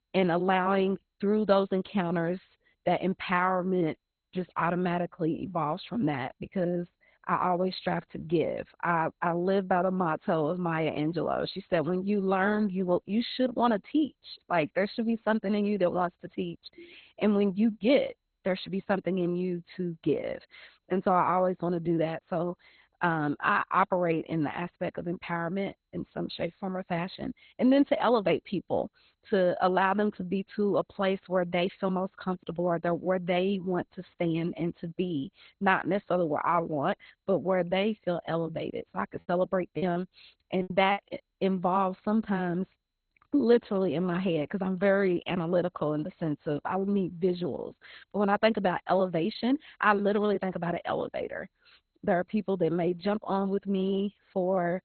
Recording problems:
garbled, watery; badly; nothing above 4 kHz
choppy; very; from 39 to 41 s; 19% of the speech affected

